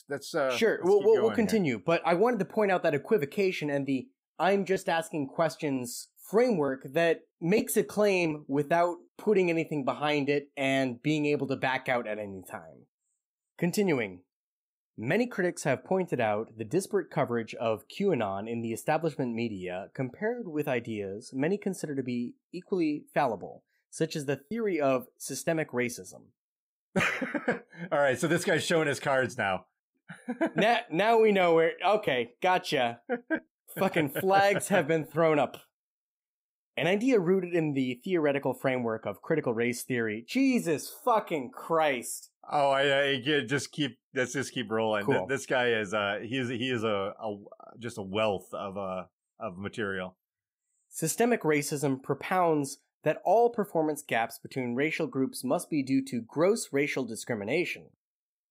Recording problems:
choppy; occasionally; from 24 to 27 s; 4% of the speech affected

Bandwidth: 15.5 kHz